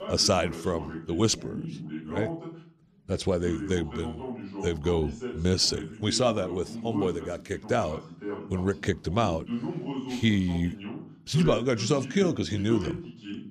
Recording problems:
voice in the background; loud; throughout; 9 dB below the speech

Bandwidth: 14.5 kHz